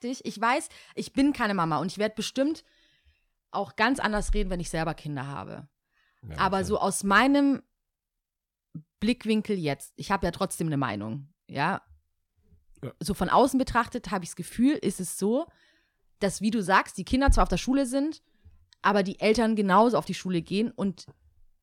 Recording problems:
none

